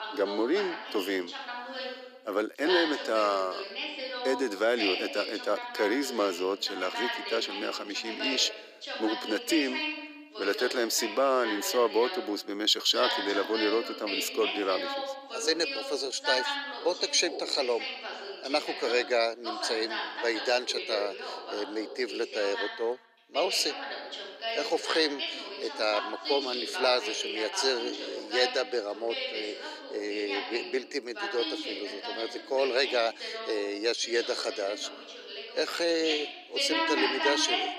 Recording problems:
thin; very; fading below 350 Hz
voice in the background; loud; throughout; 5 dB below the speech

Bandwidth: 15 kHz